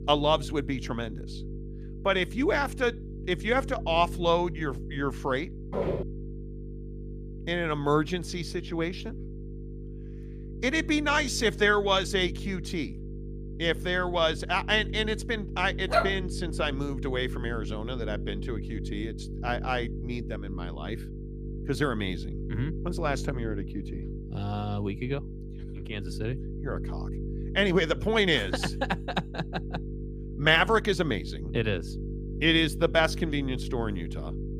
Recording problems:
electrical hum; noticeable; throughout; 50 Hz, 20 dB below the speech
footsteps; noticeable; at 5.5 s; peak 2 dB below the speech
dog barking; loud; at 16 s; peak 1 dB above the speech

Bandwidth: 15 kHz